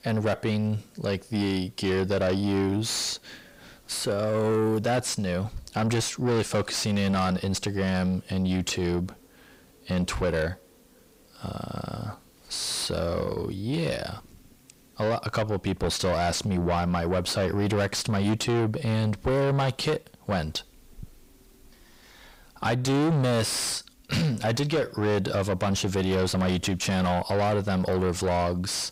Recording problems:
distortion; heavy; 7 dB below the speech

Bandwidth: 15.5 kHz